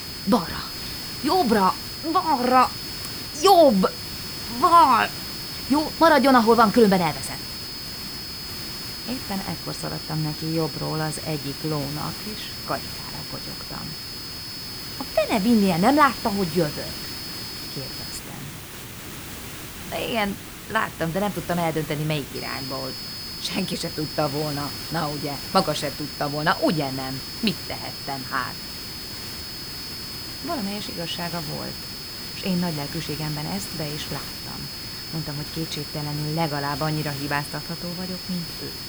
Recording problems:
high-pitched whine; loud; until 18 s and from 22 s on; 5 kHz, 10 dB below the speech
hiss; noticeable; throughout; 10 dB below the speech

